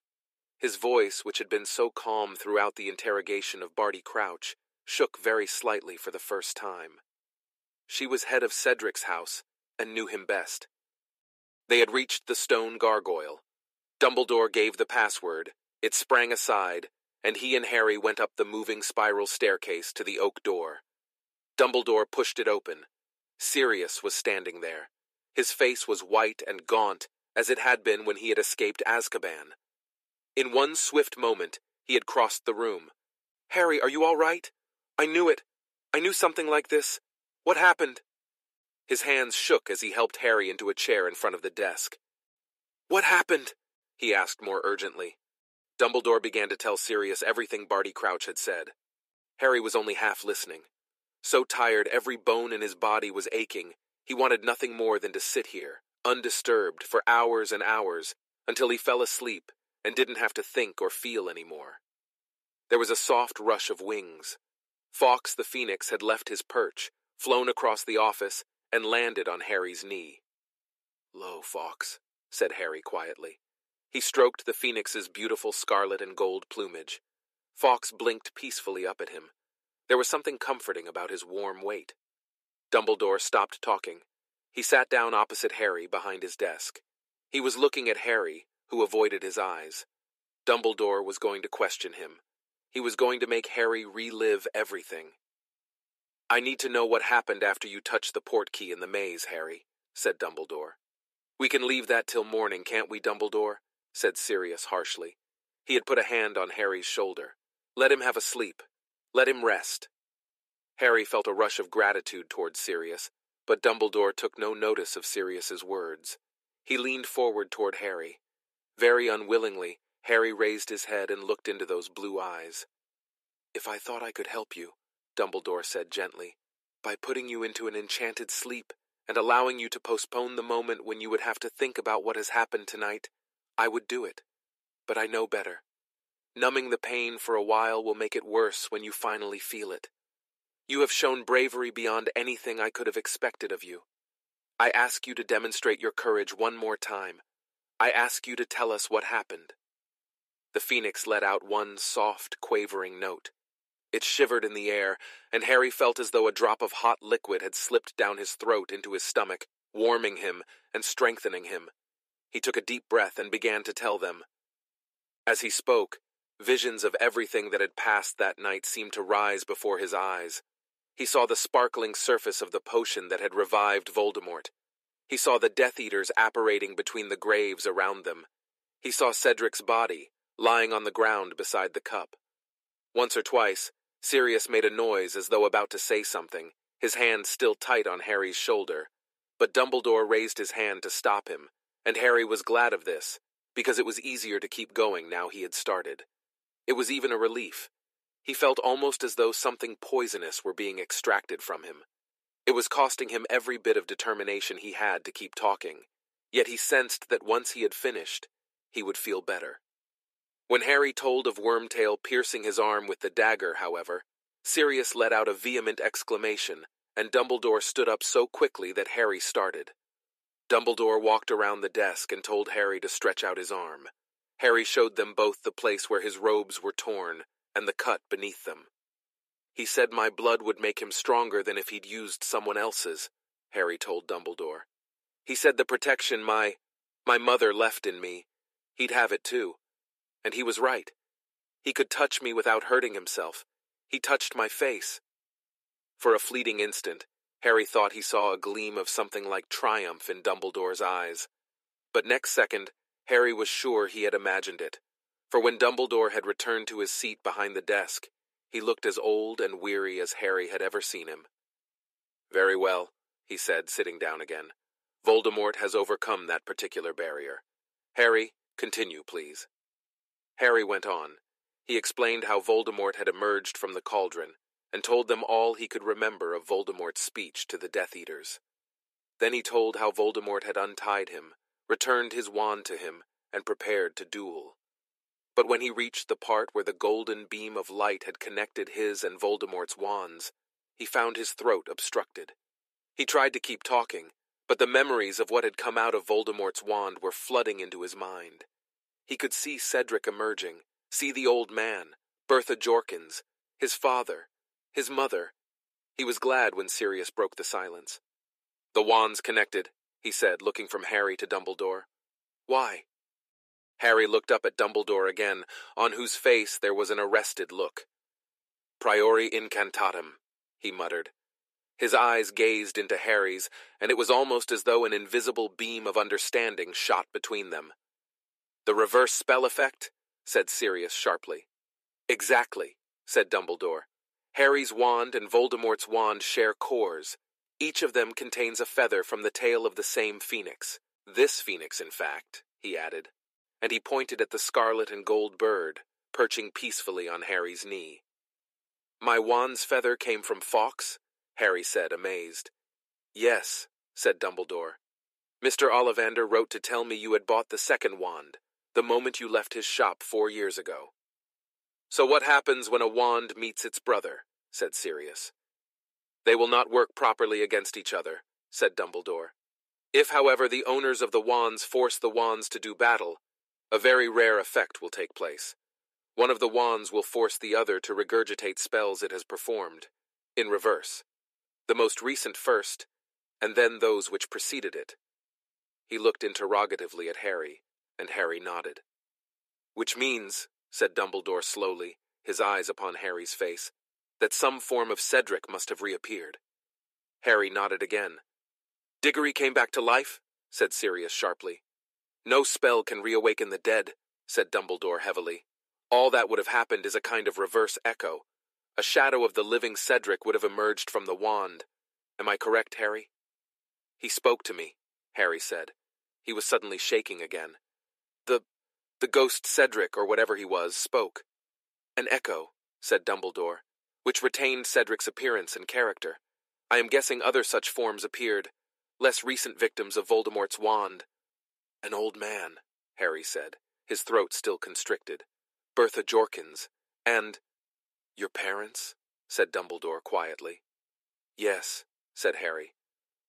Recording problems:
thin; very; fading below 350 Hz

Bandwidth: 14.5 kHz